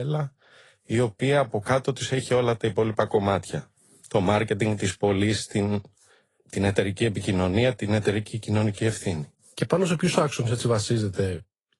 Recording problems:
garbled, watery; slightly
abrupt cut into speech; at the start

